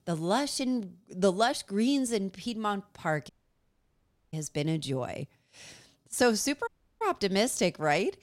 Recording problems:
audio cutting out; at 3.5 s for 1 s and at 6.5 s

